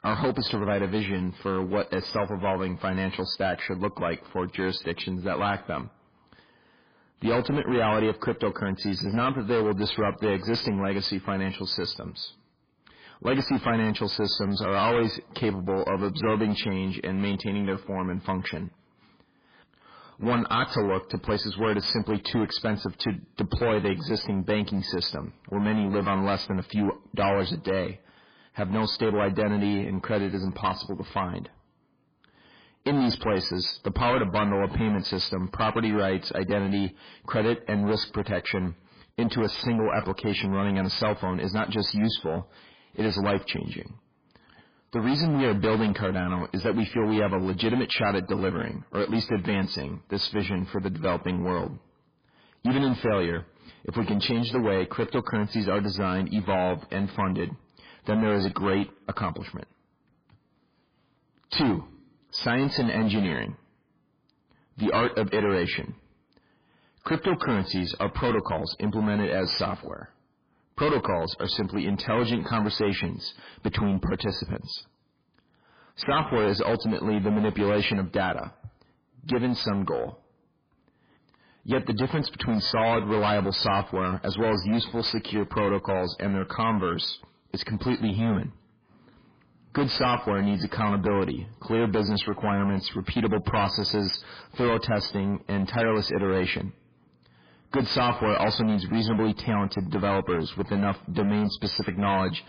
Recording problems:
distortion; heavy; 13% of the sound clipped
garbled, watery; badly; nothing above 5 kHz

